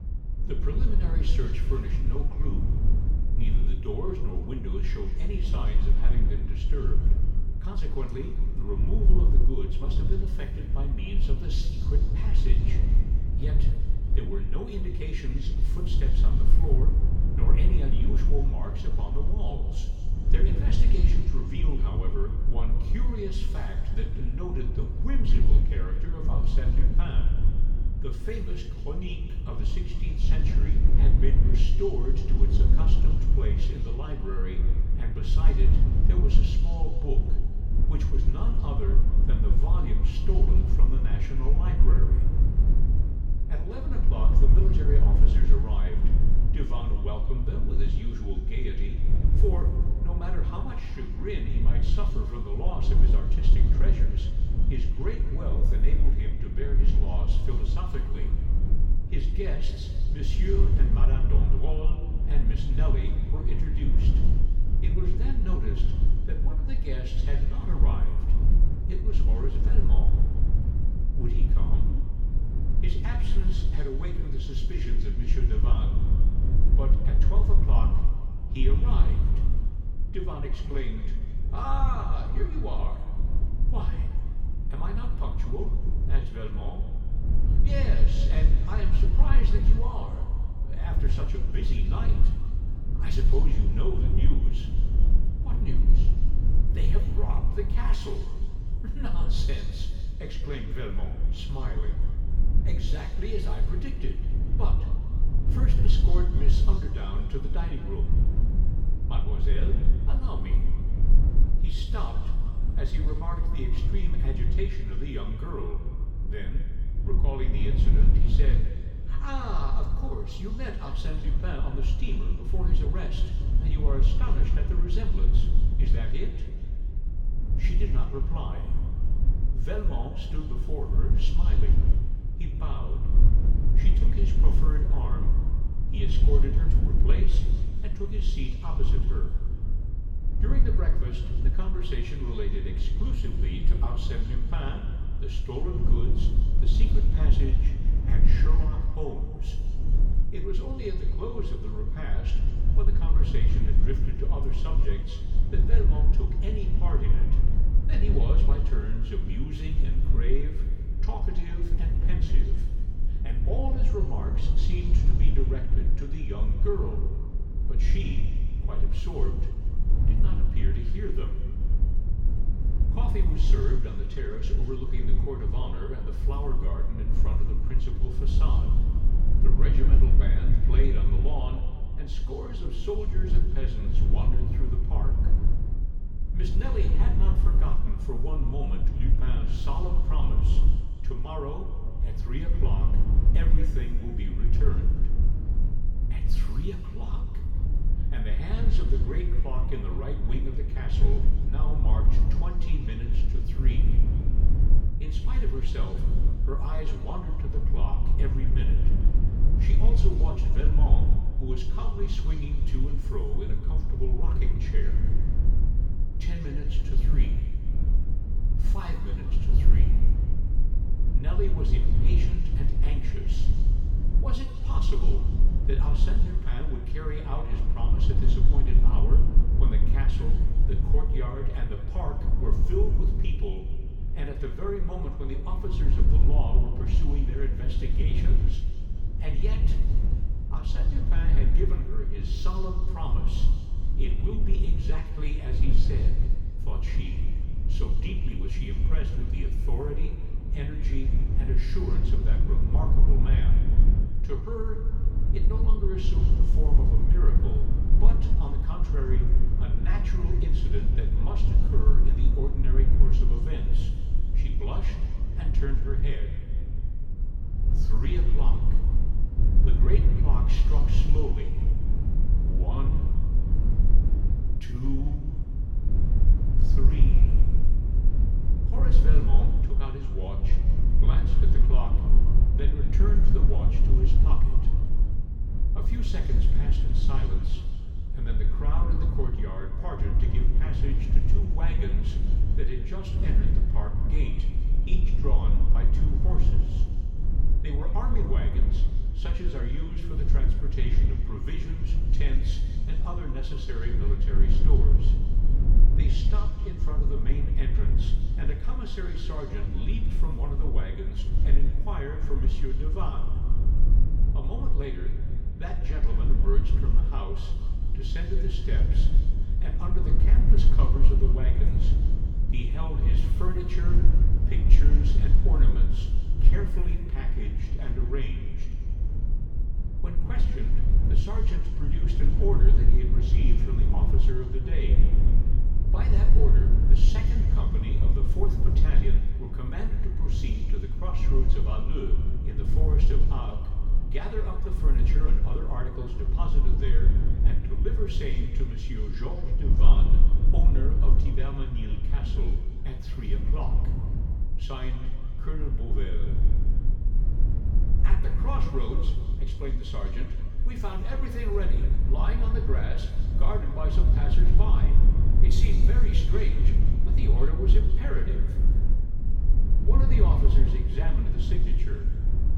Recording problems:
off-mic speech; far
room echo; noticeable; dies away in 1.8 s
low rumble; loud; throughout; 4 dB below the speech

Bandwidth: 18 kHz